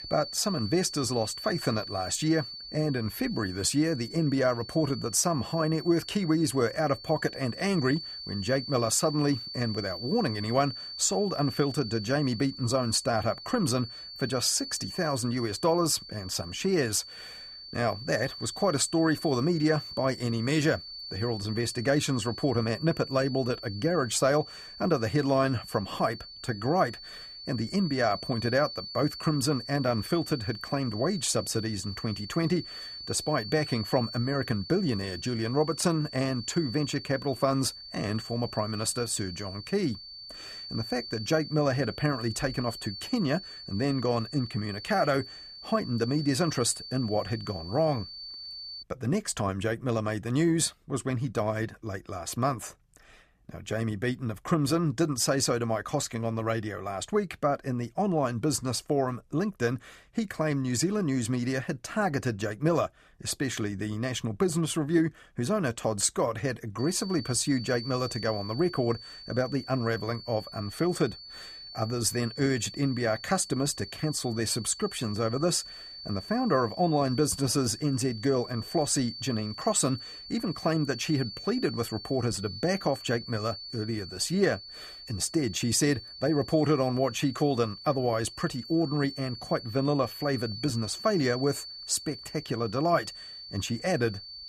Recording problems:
high-pitched whine; noticeable; until 49 s and from 1:07 on; 4.5 kHz, 10 dB below the speech

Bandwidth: 14.5 kHz